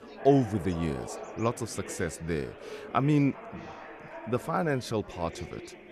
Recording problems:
chatter from many people; noticeable; throughout; 15 dB below the speech

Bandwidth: 13.5 kHz